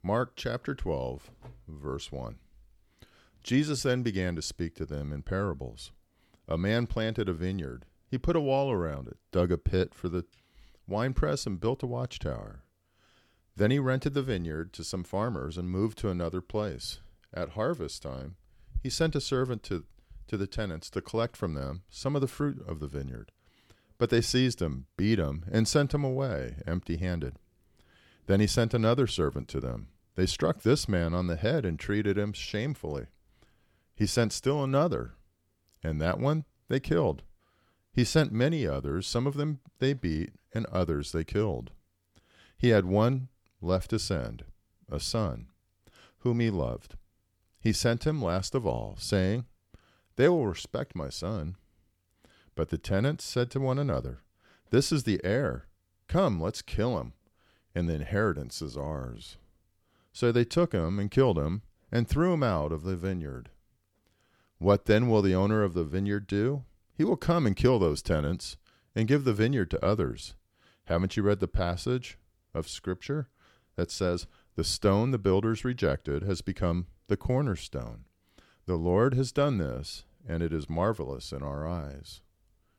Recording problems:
none

